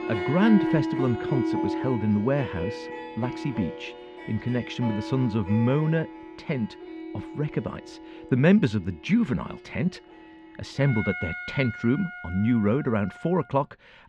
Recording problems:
muffled; slightly; fading above 3 kHz
background music; loud; throughout; 7 dB below the speech

